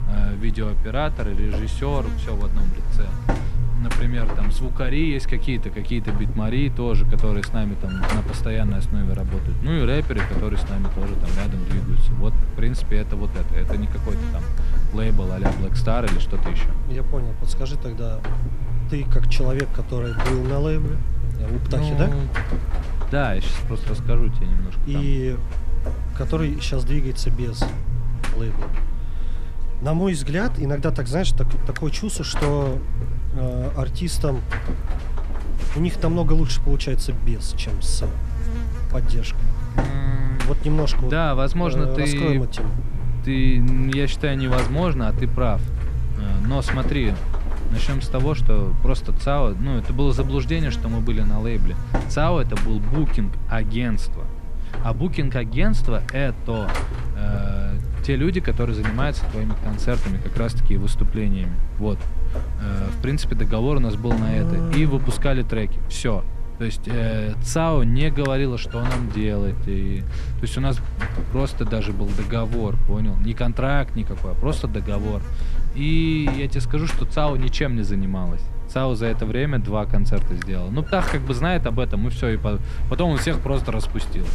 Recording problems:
electrical hum; loud; throughout; 50 Hz, 8 dB below the speech

